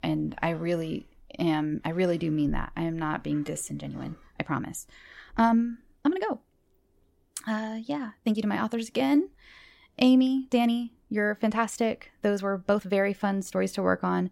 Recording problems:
uneven, jittery; strongly; from 1.5 to 14 s

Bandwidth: 16 kHz